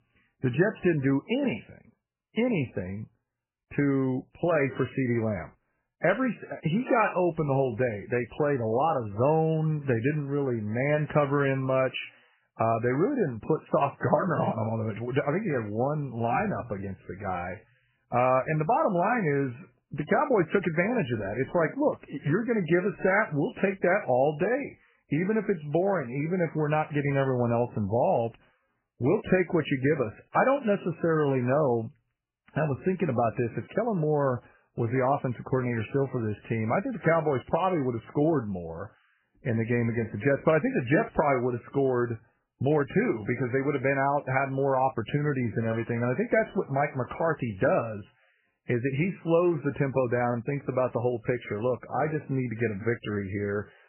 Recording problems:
garbled, watery; badly; nothing above 3 kHz

